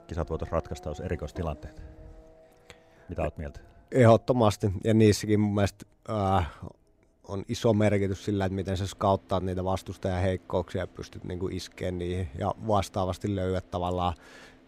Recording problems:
traffic noise; faint; throughout; 25 dB below the speech

